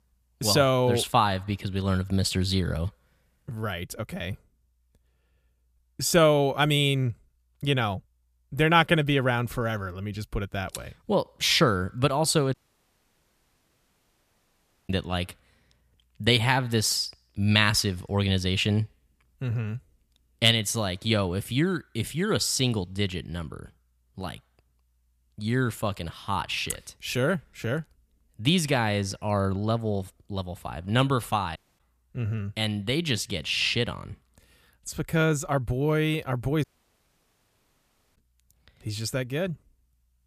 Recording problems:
audio cutting out; at 13 s for 2.5 s, at 32 s and at 37 s for 1.5 s

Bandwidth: 14.5 kHz